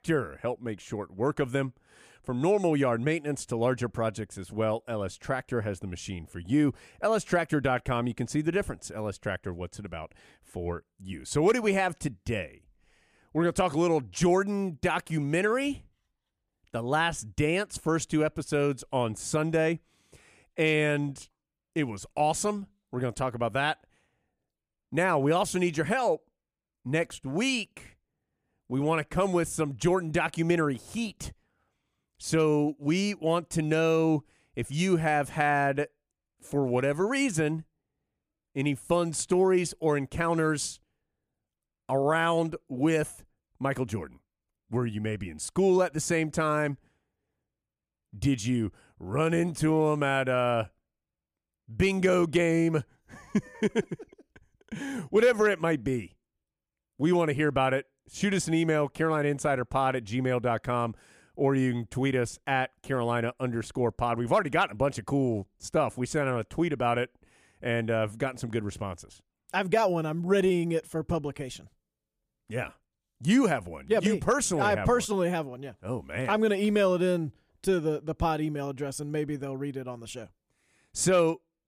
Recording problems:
none

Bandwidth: 14.5 kHz